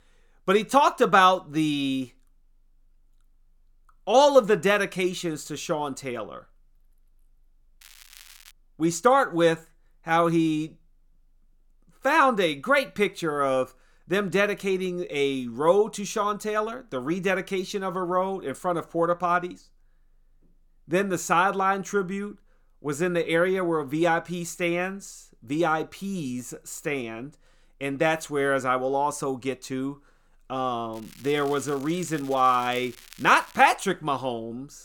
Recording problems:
crackling; faint; at 8 s and from 31 to 34 s; 25 dB below the speech

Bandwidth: 17 kHz